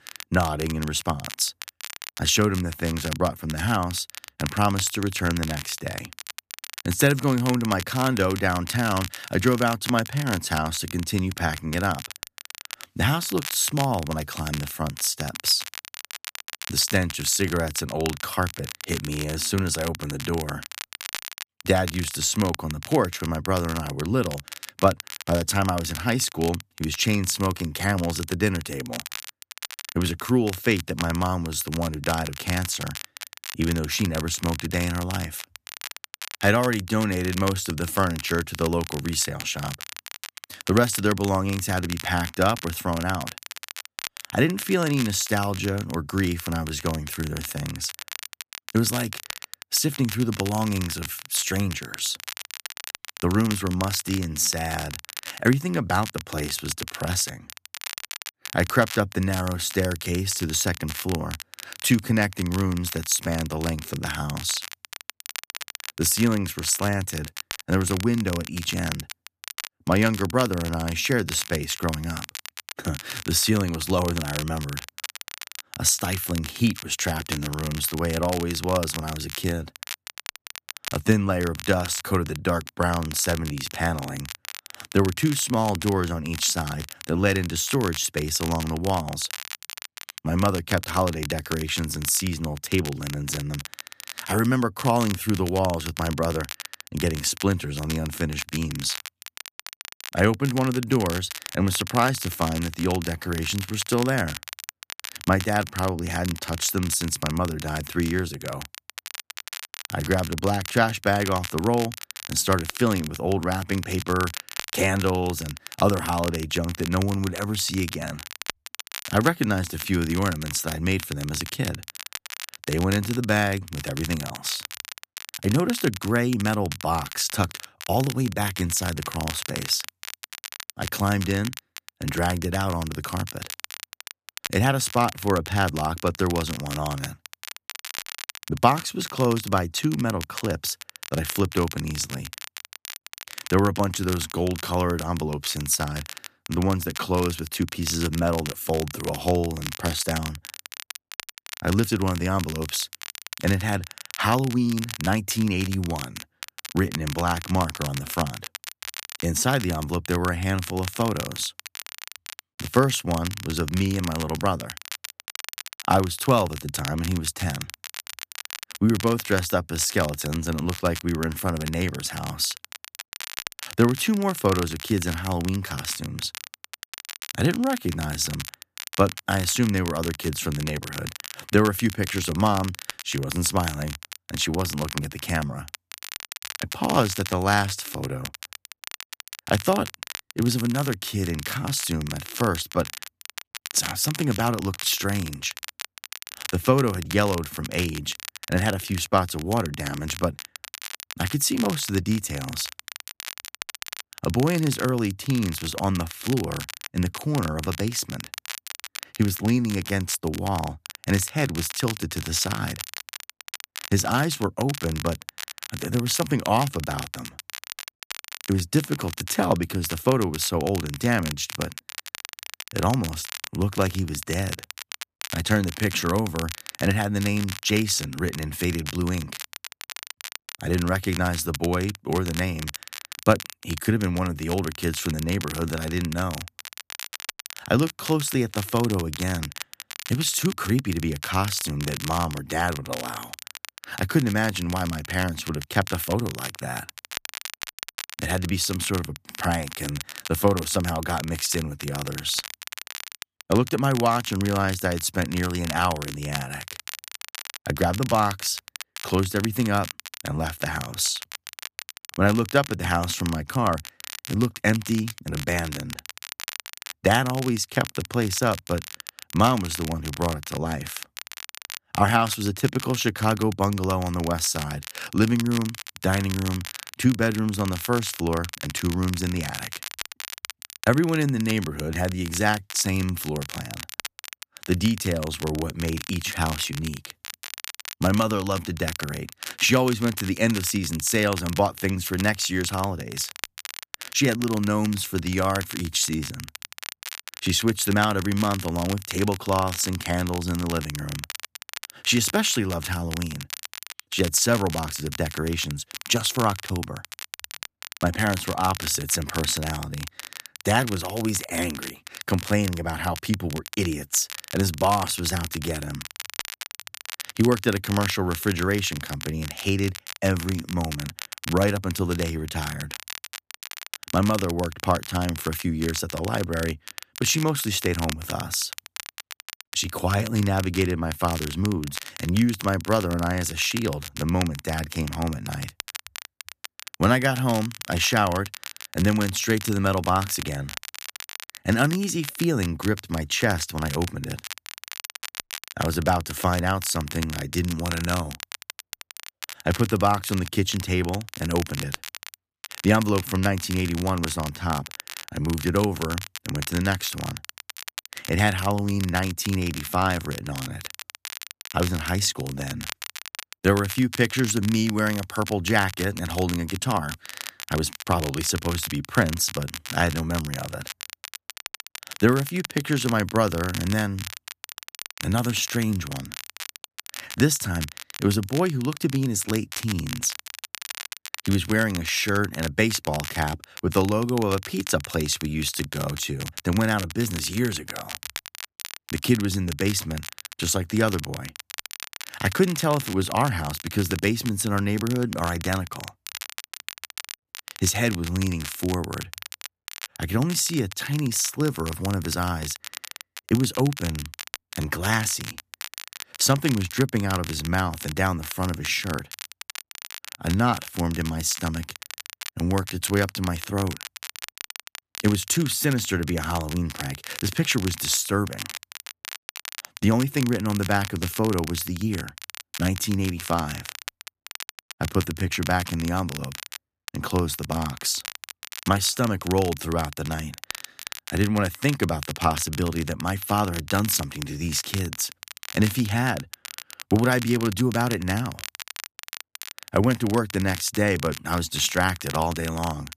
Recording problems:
crackle, like an old record; noticeable; 10 dB below the speech

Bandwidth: 14.5 kHz